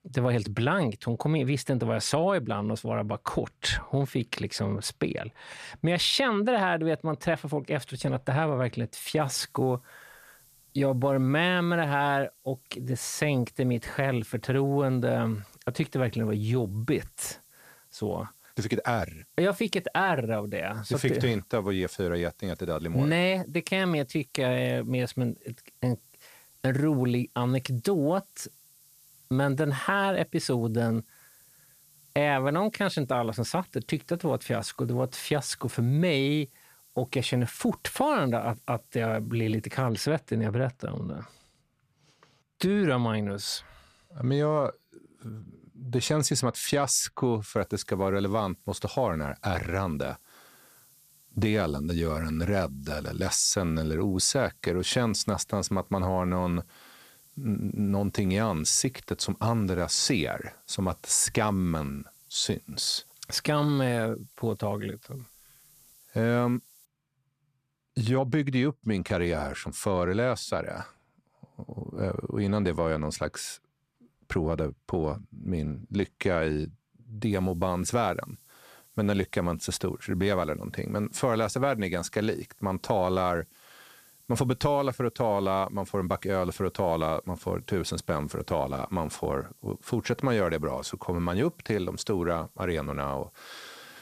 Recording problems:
hiss; faint; from 9 to 40 s, from 48 s to 1:07 and from 1:17 on; 25 dB below the speech

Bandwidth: 14.5 kHz